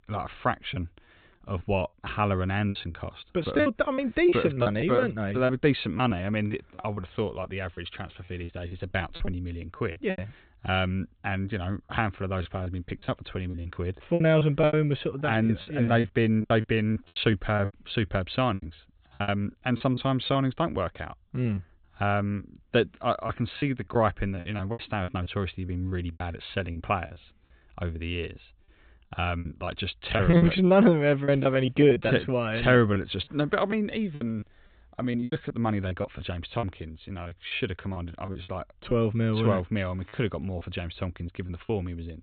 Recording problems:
high frequencies cut off; severe; nothing above 4 kHz
choppy; very; 11% of the speech affected

